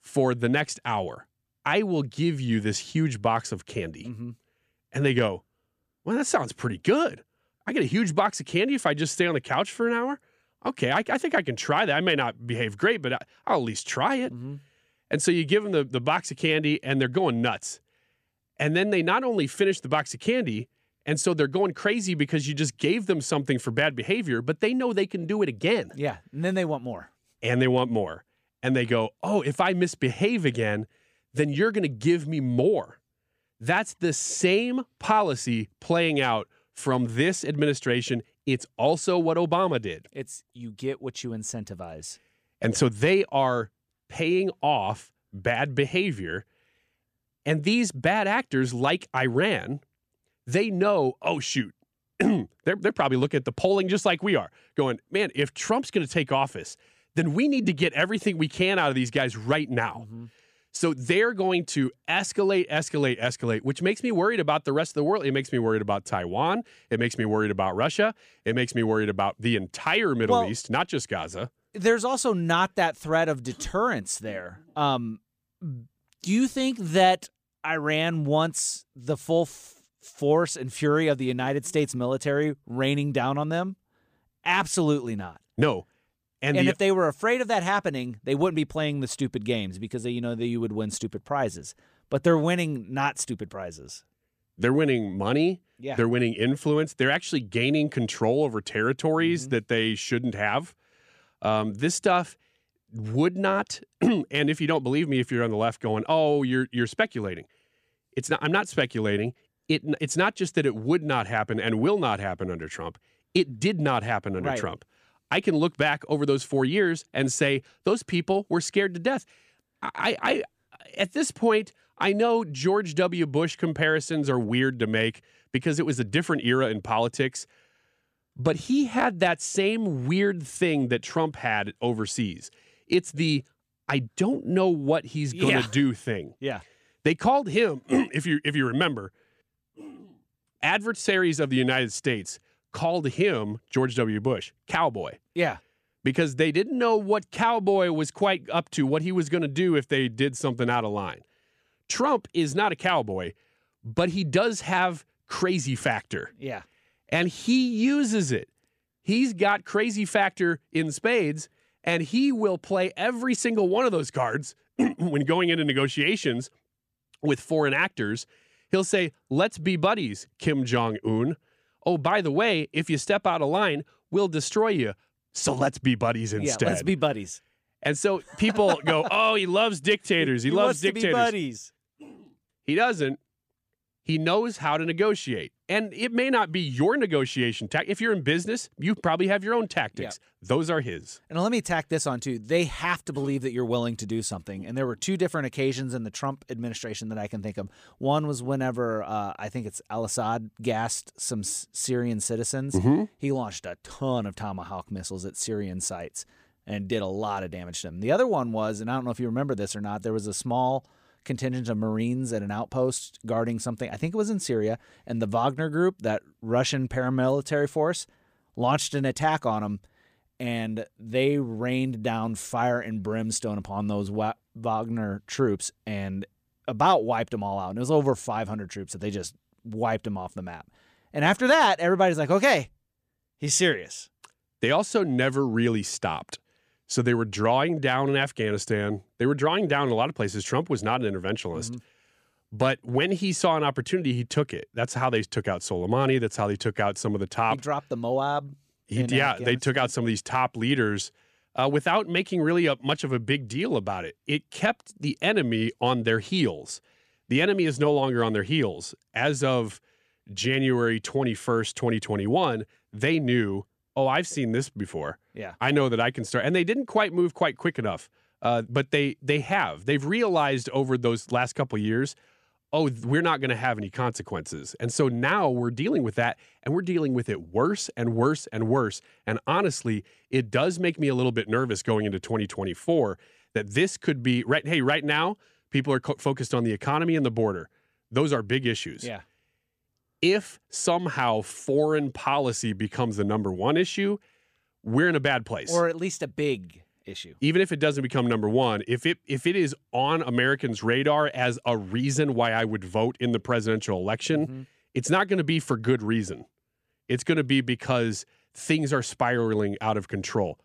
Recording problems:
none

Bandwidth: 15 kHz